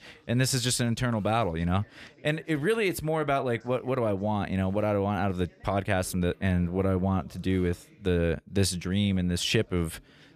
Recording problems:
background chatter; faint; throughout; 2 voices, 30 dB below the speech

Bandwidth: 14.5 kHz